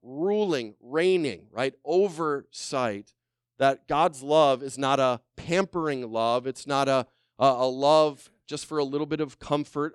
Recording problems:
none

